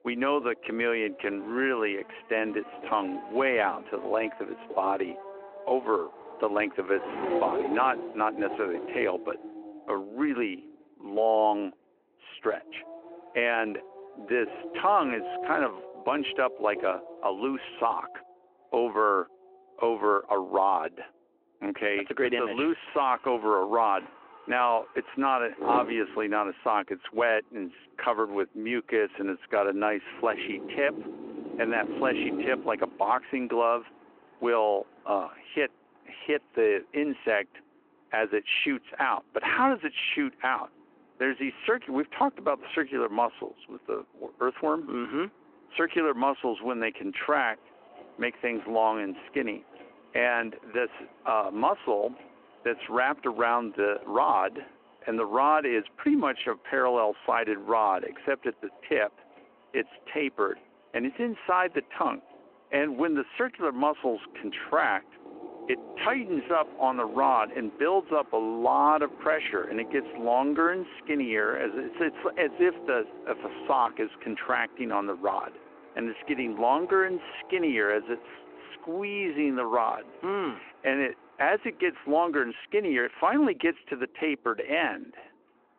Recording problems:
phone-call audio
traffic noise; noticeable; throughout; 15 dB below the speech

